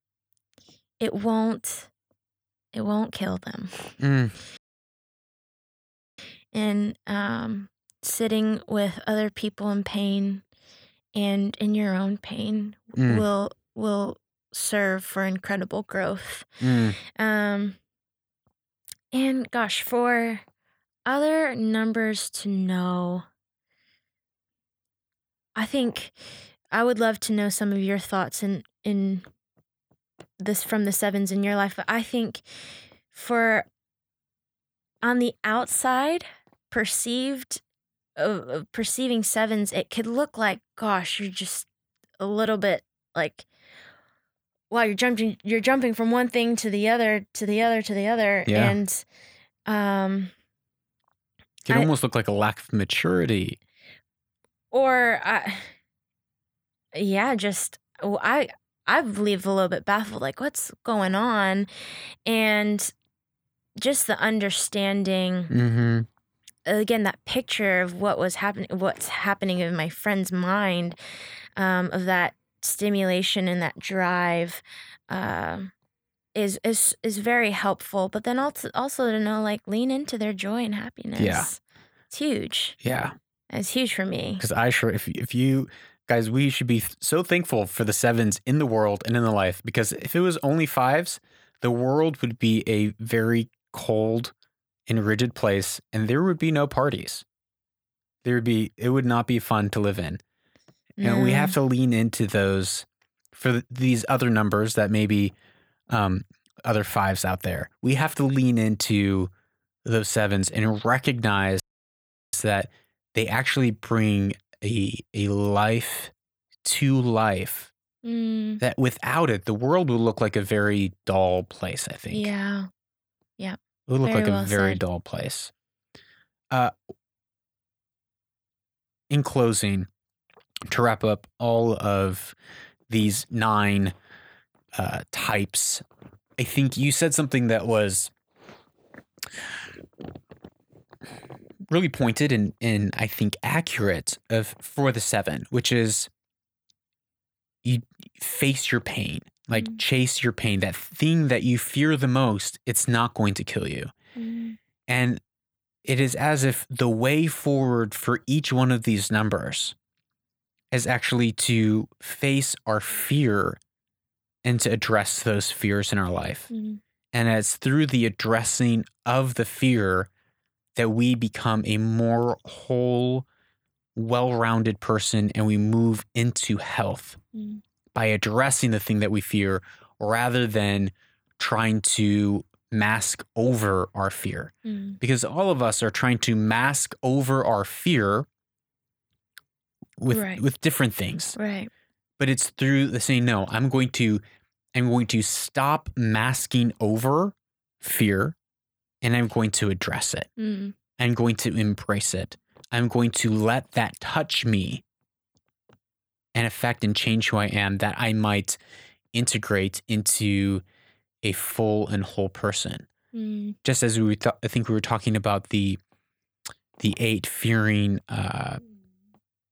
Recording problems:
audio cutting out; at 4.5 s for 1.5 s and at 1:52 for 0.5 s

